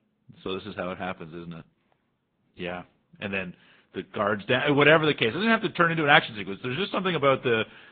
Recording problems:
high frequencies cut off; severe; nothing above 3.5 kHz
garbled, watery; slightly

